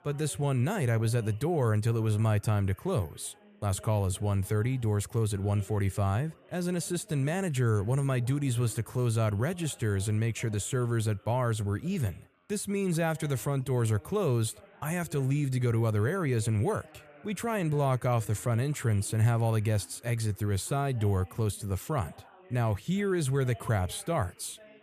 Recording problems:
background chatter; faint; throughout; 3 voices, 25 dB below the speech

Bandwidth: 14.5 kHz